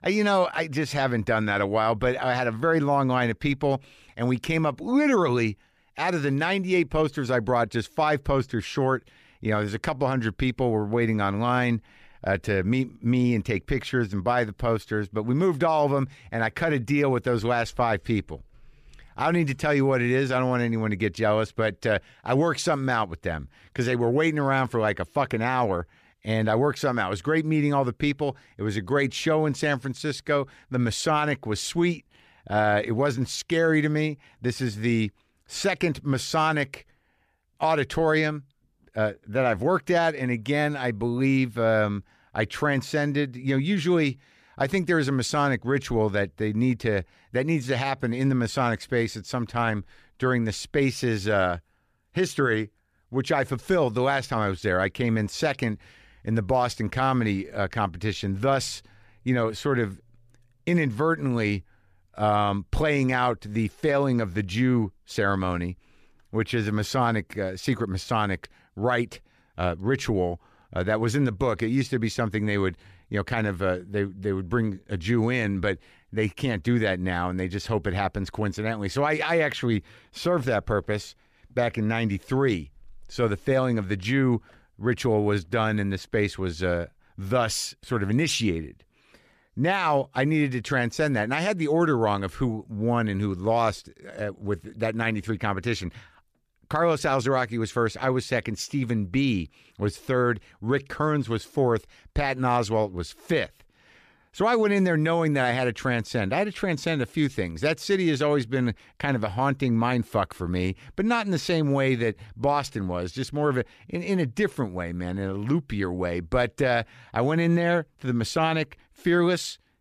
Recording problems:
none

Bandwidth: 14.5 kHz